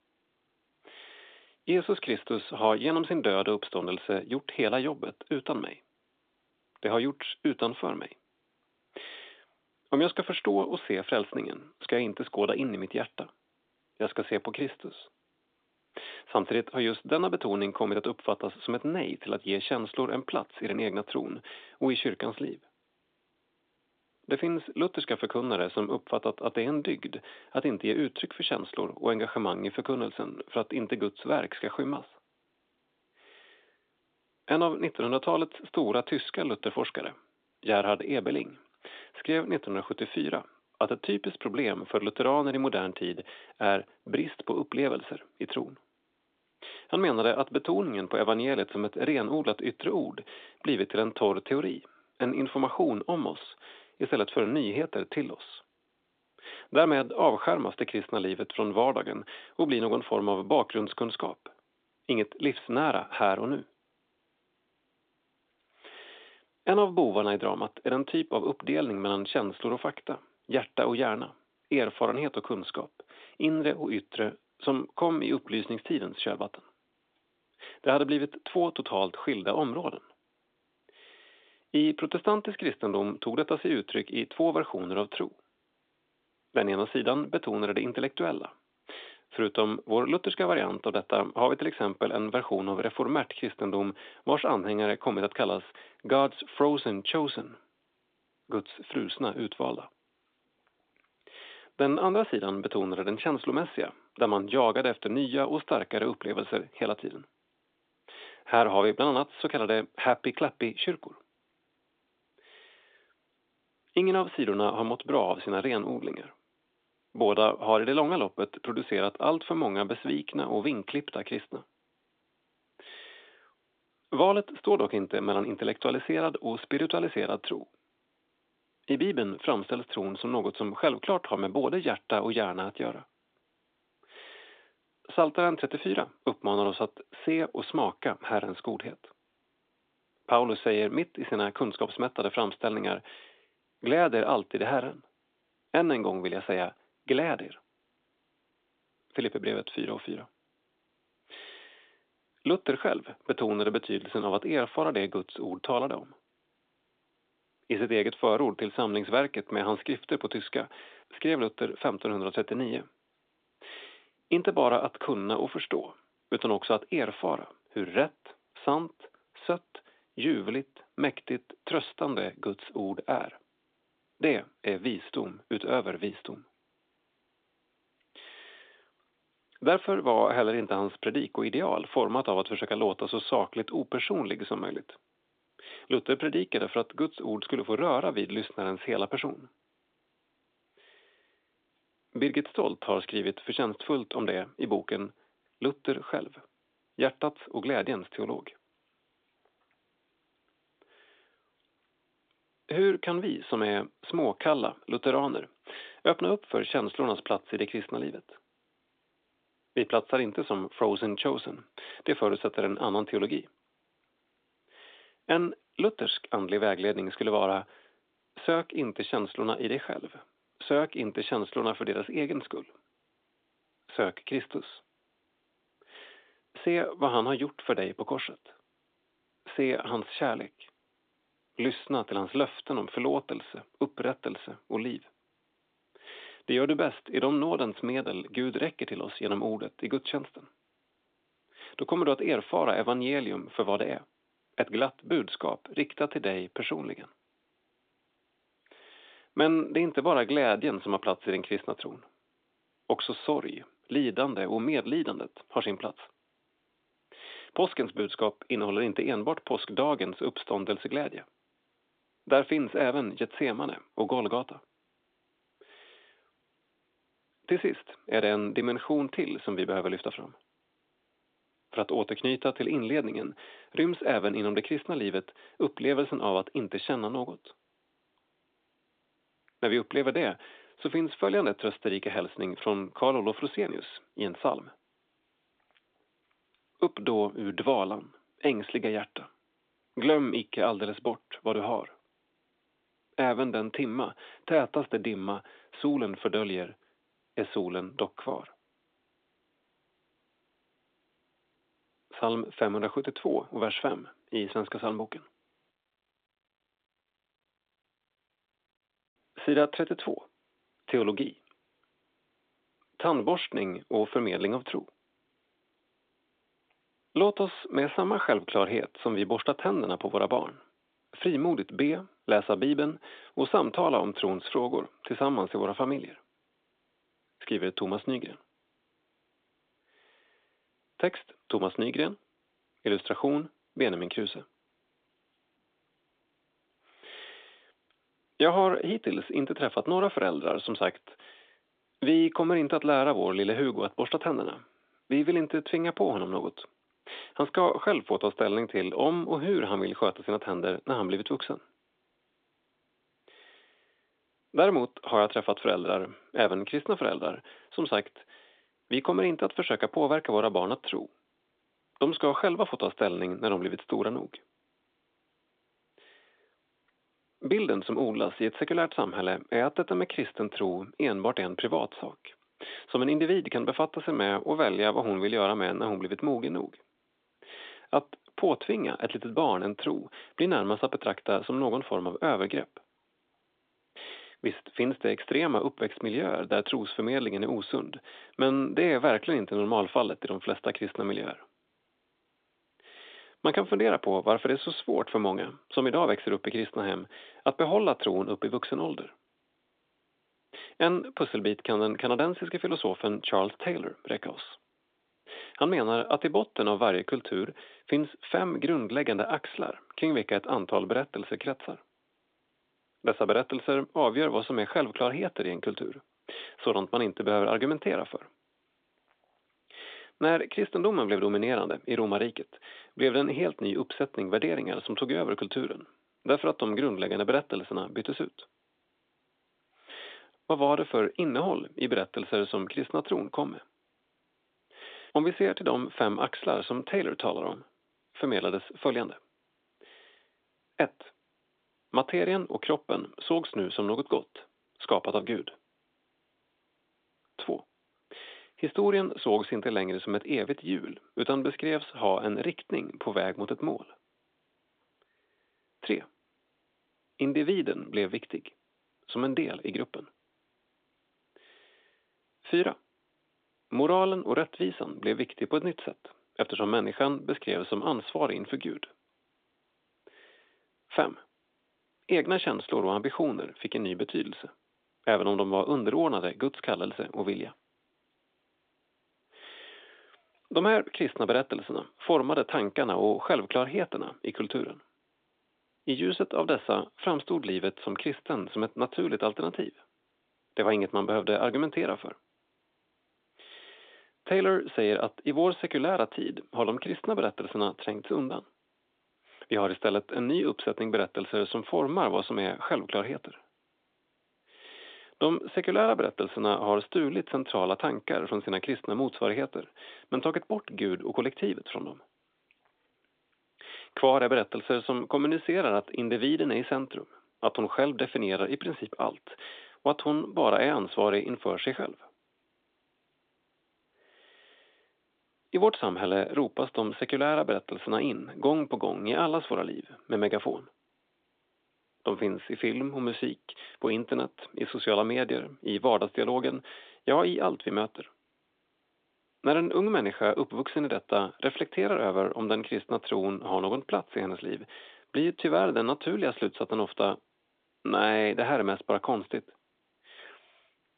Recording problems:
phone-call audio; nothing above 3.5 kHz

